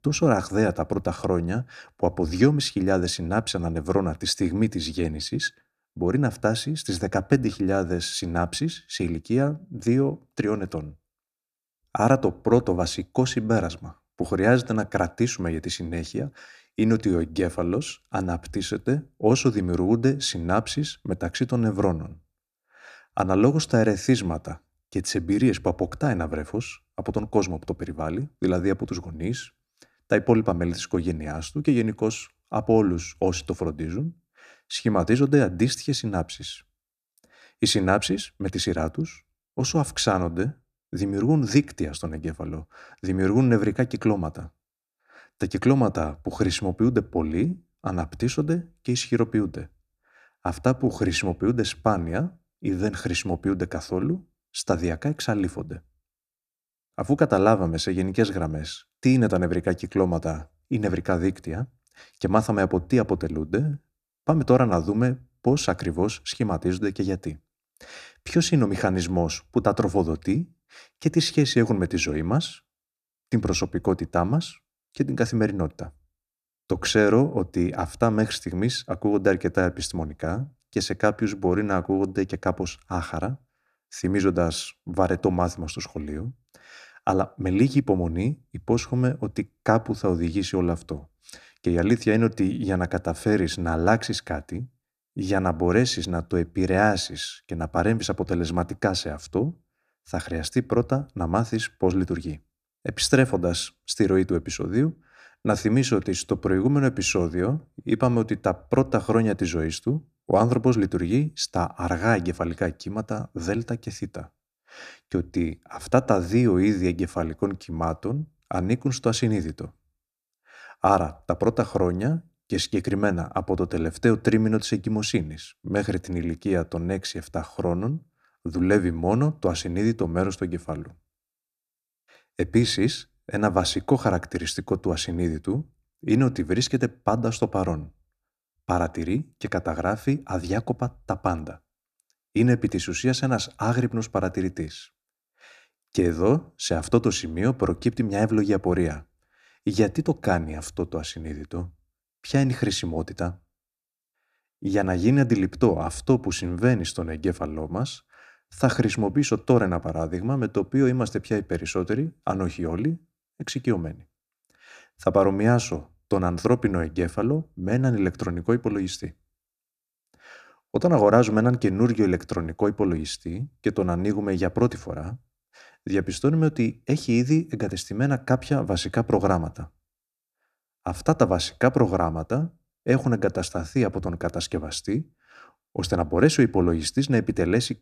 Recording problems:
none

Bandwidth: 14.5 kHz